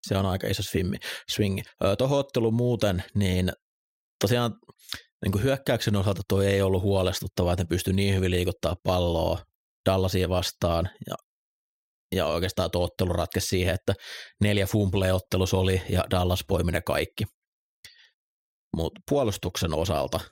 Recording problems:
none

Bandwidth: 16 kHz